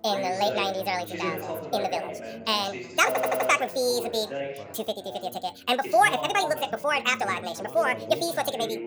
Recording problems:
wrong speed and pitch; too fast and too high; 1.7 times normal speed
background chatter; loud; throughout; 3 voices, 9 dB below the speech
audio stuttering; at 3 s

